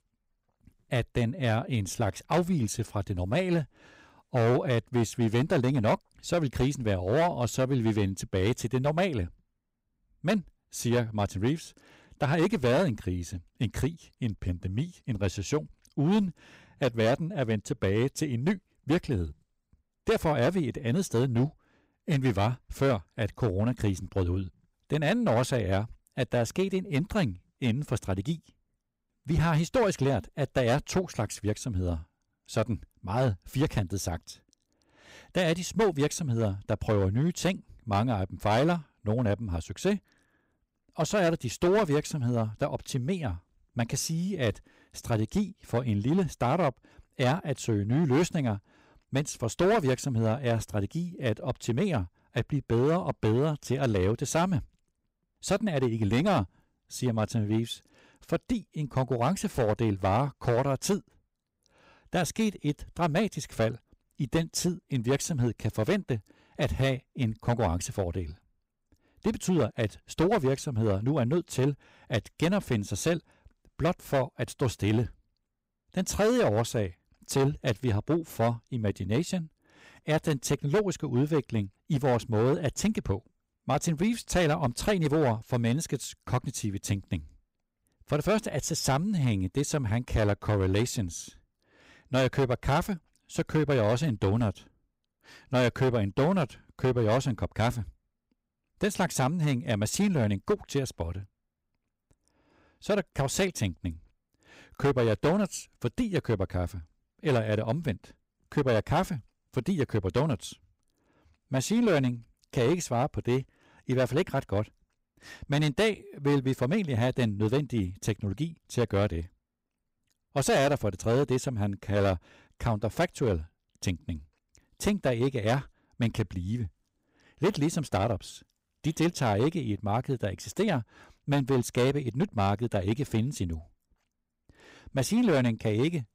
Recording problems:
distortion; slight; 6% of the sound clipped

